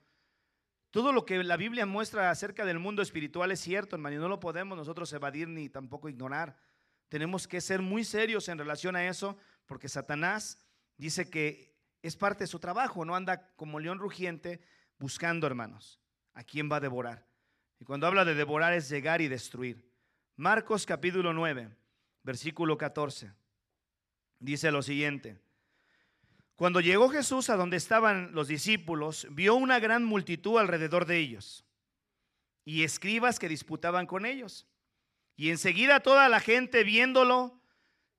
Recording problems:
none

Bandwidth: 13.5 kHz